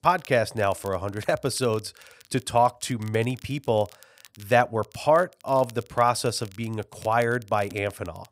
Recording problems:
crackle, like an old record; faint; 25 dB below the speech

